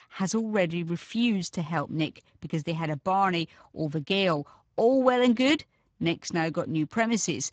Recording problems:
garbled, watery; badly

